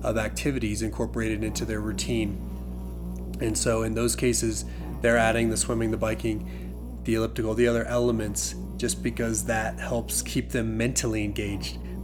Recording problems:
electrical hum; noticeable; throughout; 60 Hz, 20 dB below the speech

